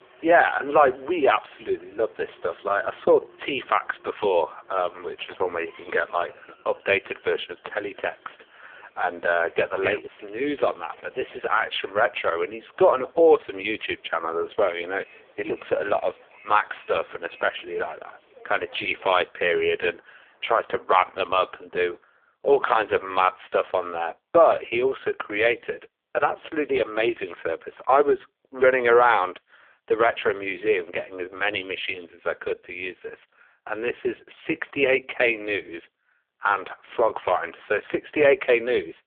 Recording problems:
phone-call audio; poor line; nothing above 3.5 kHz
traffic noise; faint; until 22 s; 30 dB below the speech

